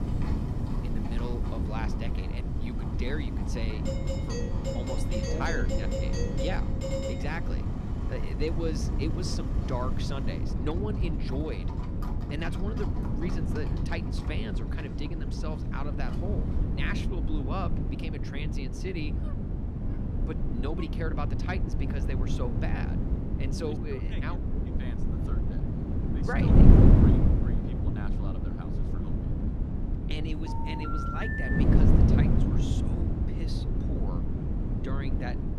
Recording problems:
wind noise on the microphone; heavy; 1 dB above the speech
animal sounds; noticeable; until 17 s; 10 dB below the speech
doorbell; loud; from 4 to 7.5 s; peak 4 dB above the speech
dog barking; faint; from 19 to 21 s; peak 15 dB below the speech
phone ringing; loud; from 30 to 32 s; peak 5 dB above the speech

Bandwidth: 14.5 kHz